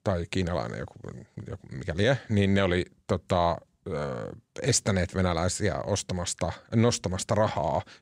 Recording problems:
none

